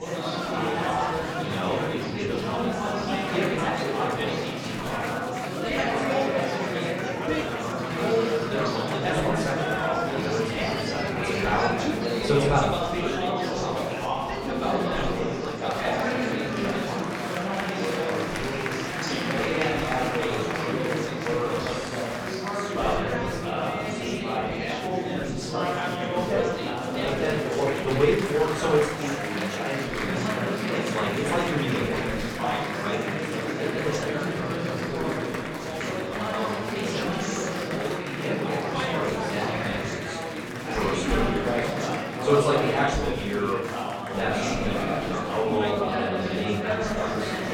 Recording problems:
off-mic speech; far
room echo; noticeable; dies away in 0.6 s
chatter from many people; very loud; throughout; 3 dB above the speech

